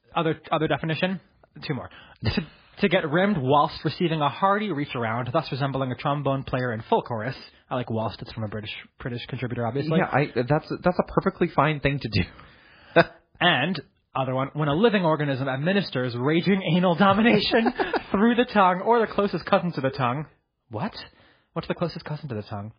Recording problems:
garbled, watery; badly

